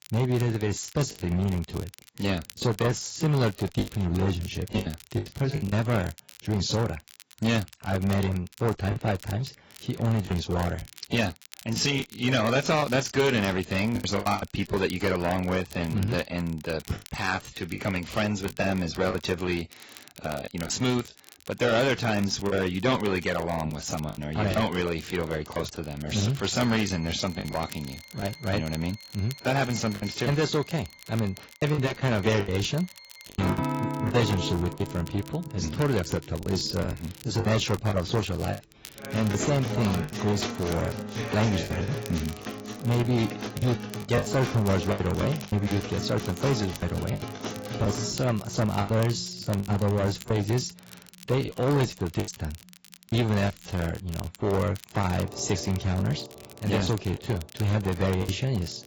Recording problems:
garbled, watery; badly; nothing above 7.5 kHz
distortion; slight; 6% of the sound clipped
background music; loud; from 27 s on; 9 dB below the speech
crackle, like an old record; noticeable; 20 dB below the speech
choppy; very; 7% of the speech affected

